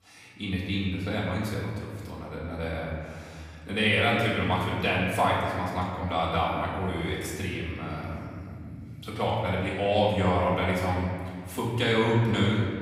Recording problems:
off-mic speech; far
room echo; noticeable; dies away in 2.2 s

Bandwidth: 15.5 kHz